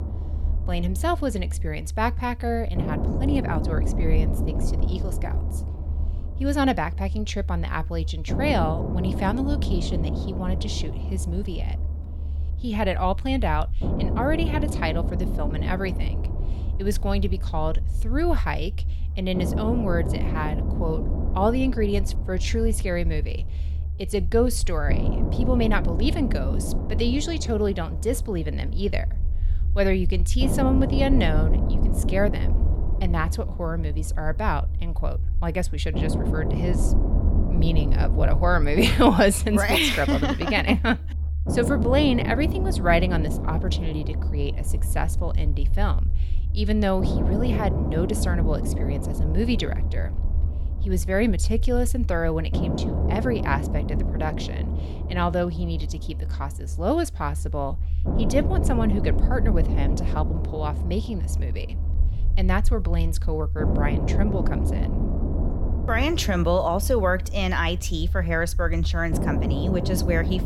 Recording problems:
low rumble; loud; throughout; 10 dB below the speech

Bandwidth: 16.5 kHz